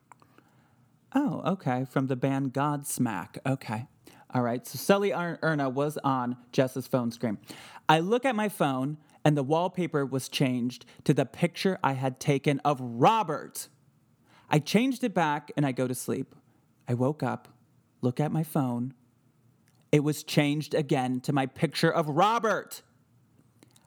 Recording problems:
none

